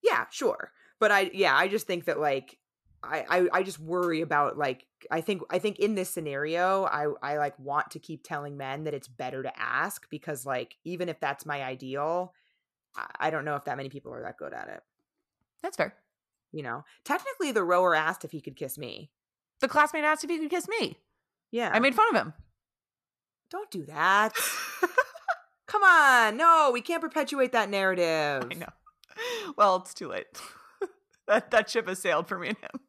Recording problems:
none

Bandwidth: 14 kHz